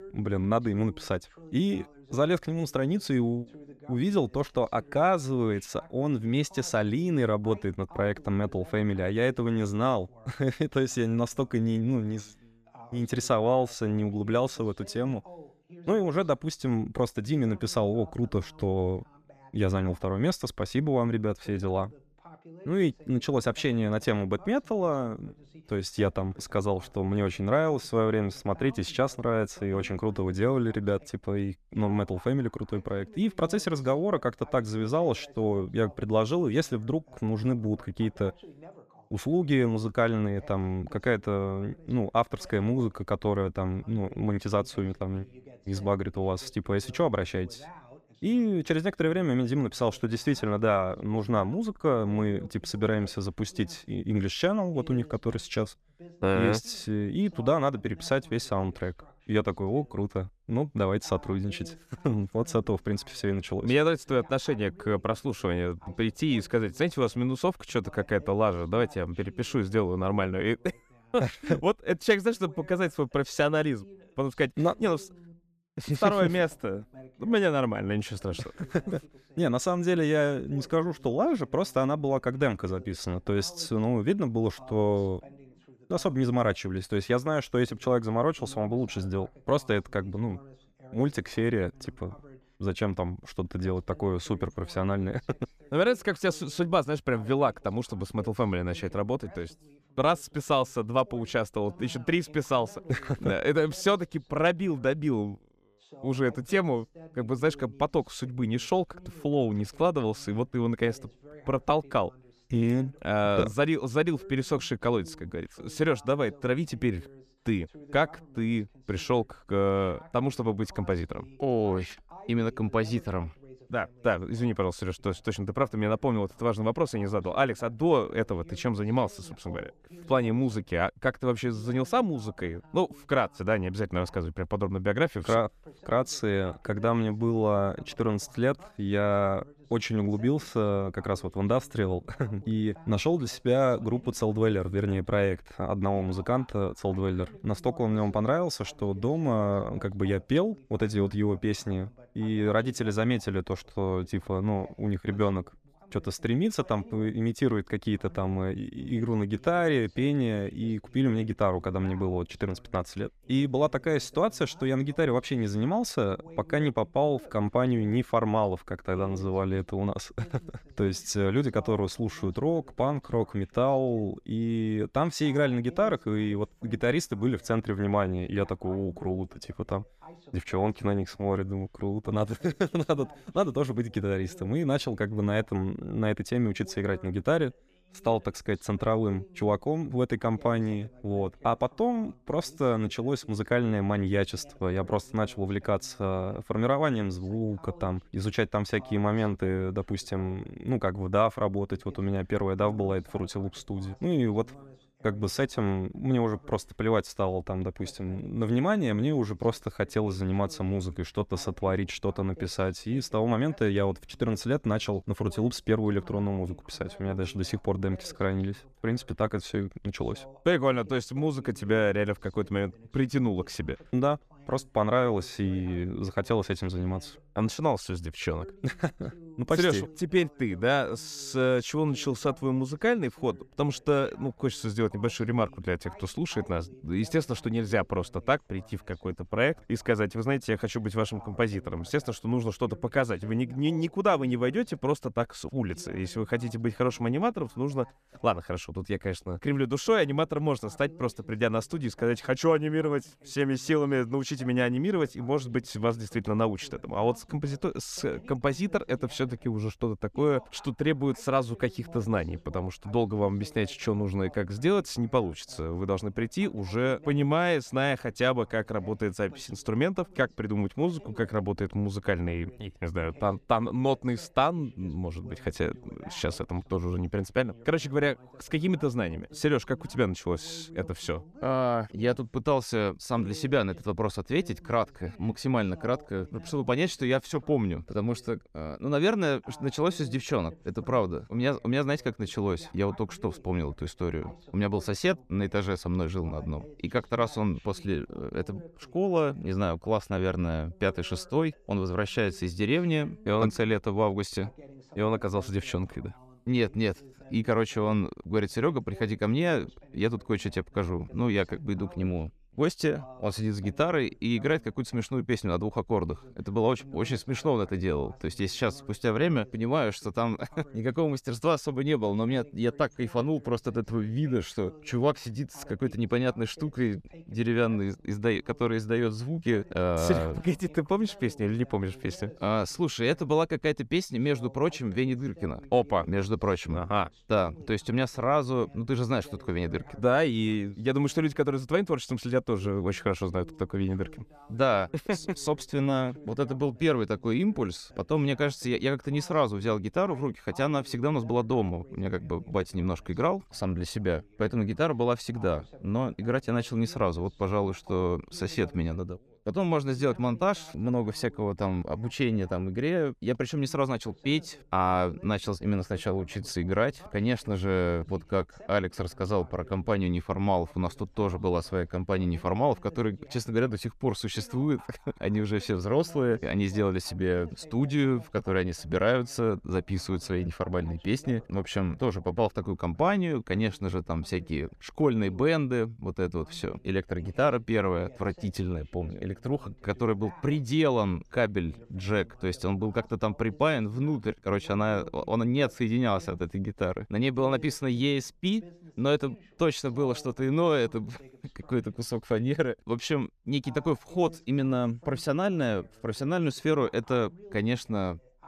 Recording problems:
voice in the background; faint; throughout; 25 dB below the speech

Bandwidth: 14.5 kHz